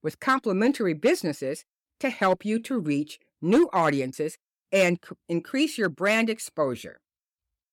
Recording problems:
none

